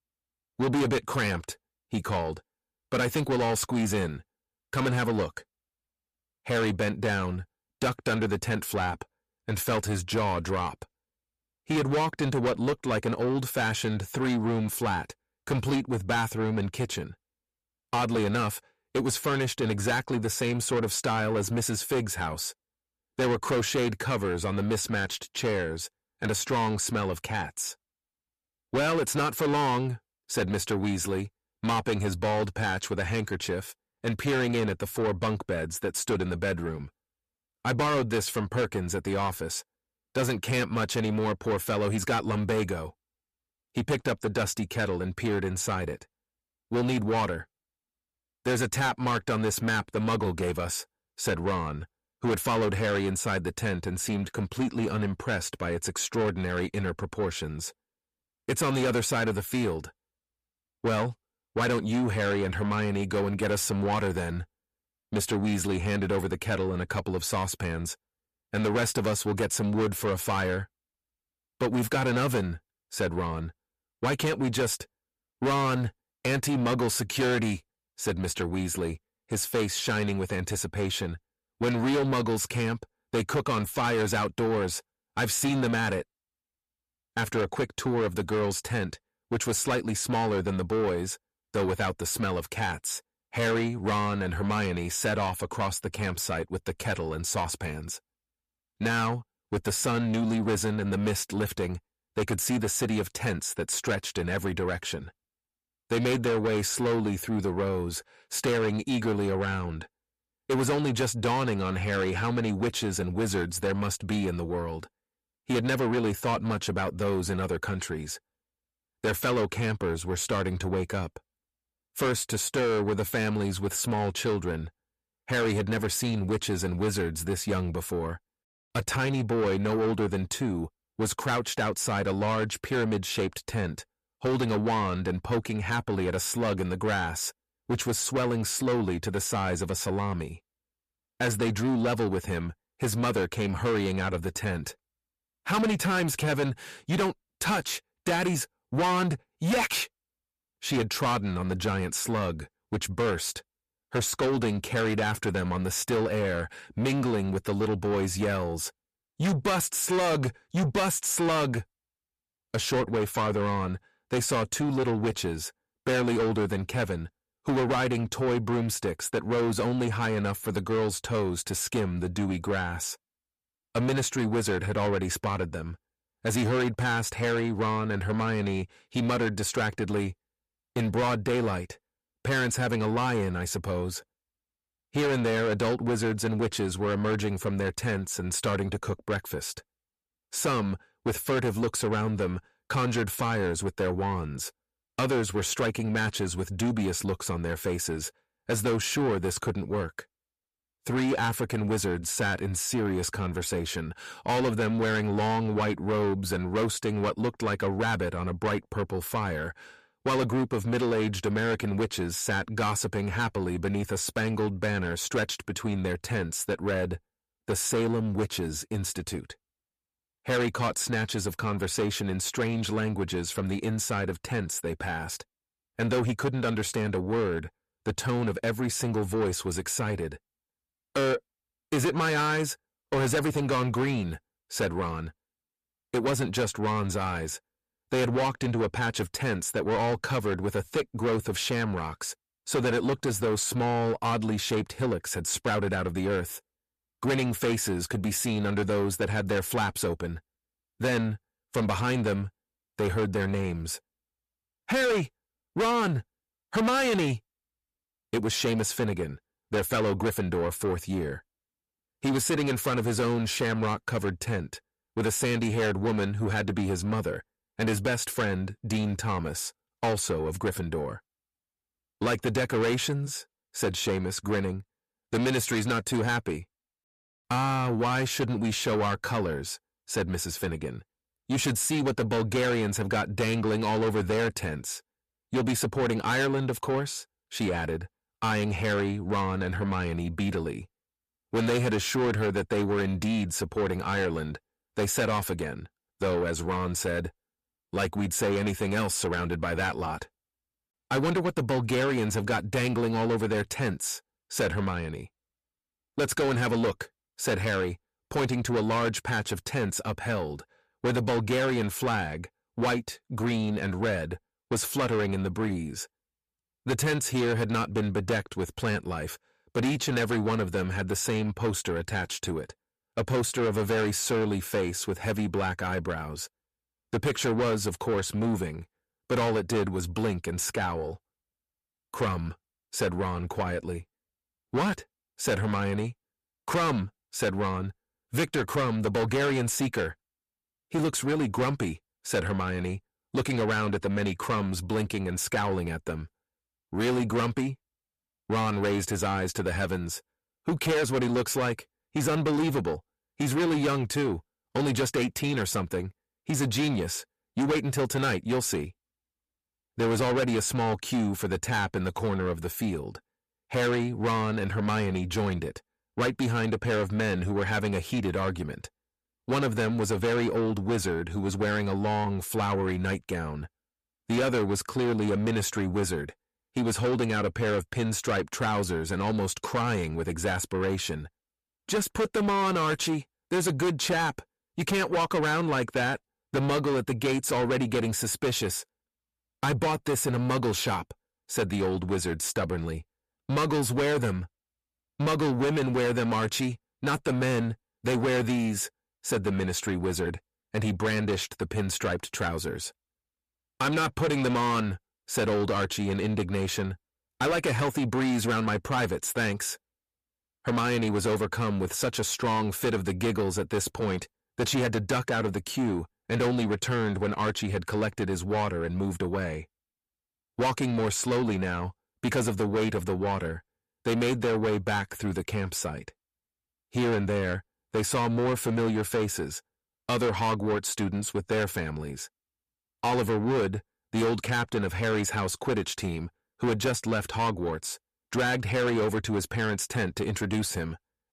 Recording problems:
distortion; heavy; 7 dB below the speech

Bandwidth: 14.5 kHz